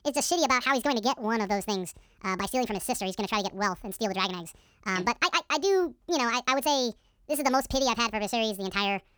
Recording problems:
wrong speed and pitch; too fast and too high; 1.7 times normal speed

